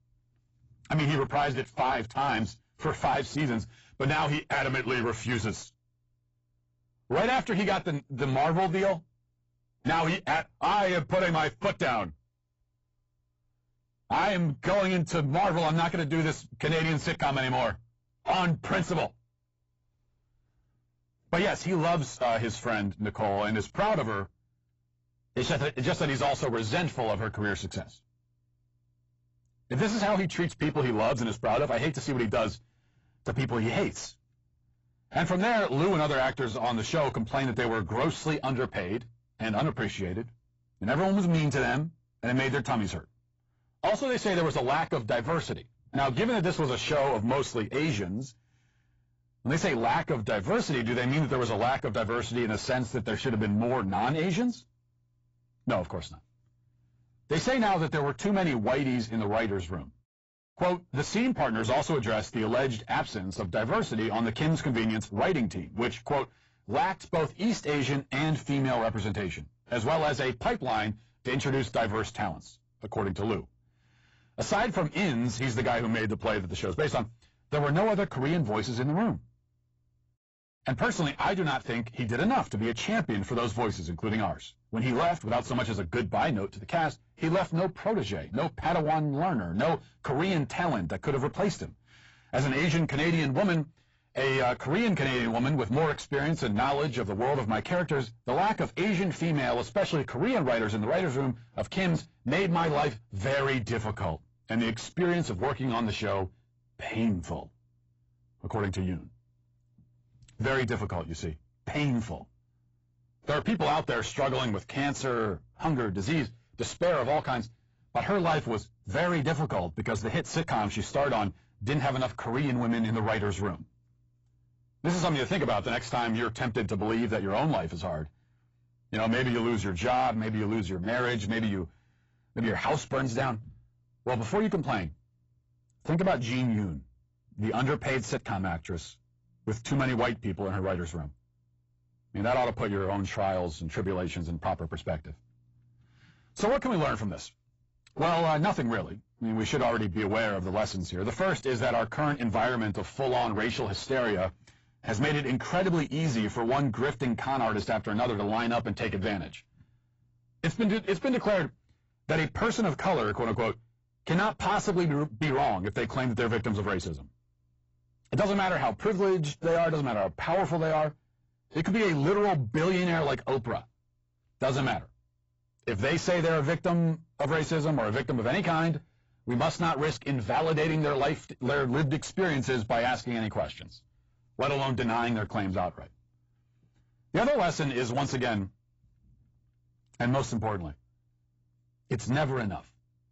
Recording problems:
distortion; heavy; 7 dB below the speech
garbled, watery; badly; nothing above 7.5 kHz

